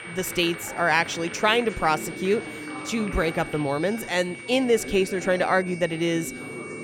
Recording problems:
high-pitched whine; noticeable; throughout; 2.5 kHz, 15 dB below the speech
chatter from many people; noticeable; throughout; 15 dB below the speech

